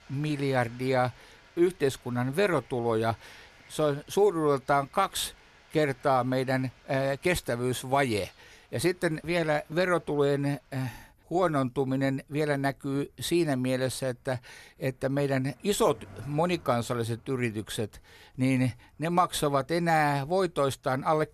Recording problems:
animal sounds; faint; throughout; 30 dB below the speech

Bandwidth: 13.5 kHz